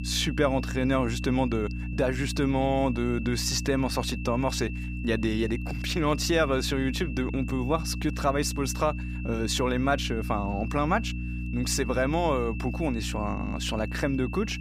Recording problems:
electrical hum; noticeable; throughout; 60 Hz, 15 dB below the speech
high-pitched whine; noticeable; throughout; 2.5 kHz, 15 dB below the speech

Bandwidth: 15.5 kHz